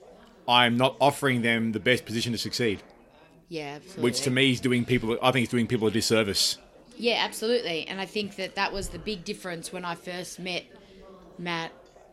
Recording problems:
background chatter; faint; throughout; 4 voices, 25 dB below the speech

